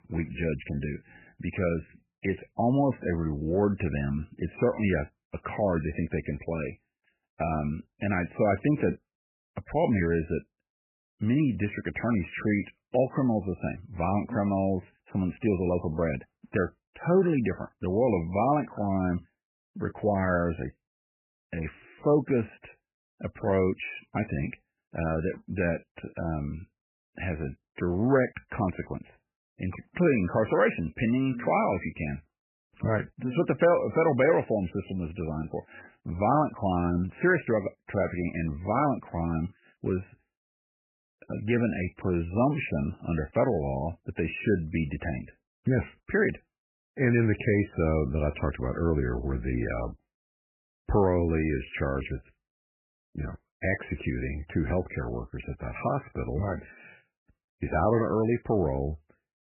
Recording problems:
garbled, watery; badly; nothing above 2.5 kHz

